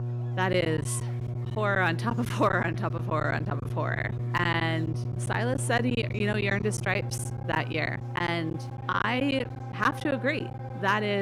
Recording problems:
electrical hum; noticeable; throughout; 60 Hz, 15 dB below the speech
background music; noticeable; throughout; 20 dB below the speech
murmuring crowd; faint; throughout; 25 dB below the speech
choppy; very; 11% of the speech affected
abrupt cut into speech; at the end

